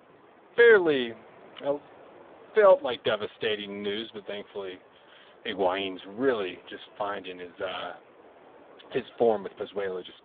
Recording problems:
phone-call audio; poor line
wind in the background; faint; throughout; 25 dB below the speech

